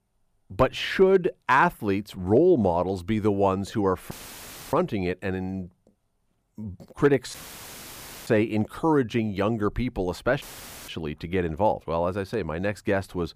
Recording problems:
audio cutting out; filled with static; at 4 s for 0.5 s, at 7.5 s for 1 s and at 10 s

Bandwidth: 15 kHz